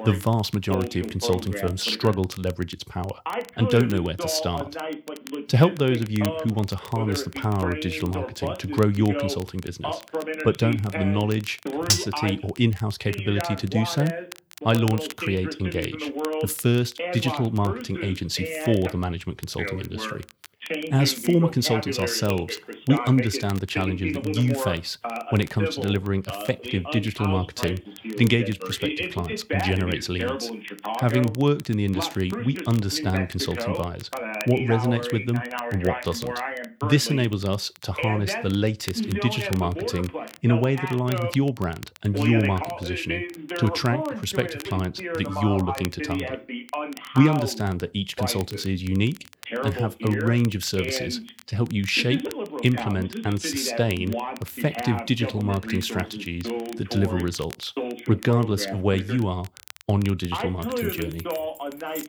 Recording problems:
voice in the background; loud; throughout; 7 dB below the speech
crackle, like an old record; noticeable; 20 dB below the speech
clattering dishes; loud; at 12 s; peak 3 dB above the speech
jangling keys; faint; from 1:01 on; peak 10 dB below the speech

